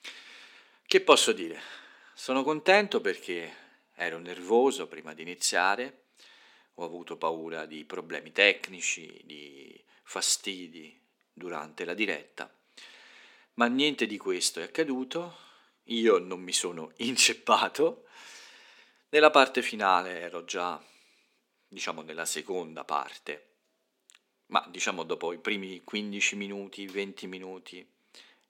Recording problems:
thin; somewhat; fading below 300 Hz

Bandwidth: 17.5 kHz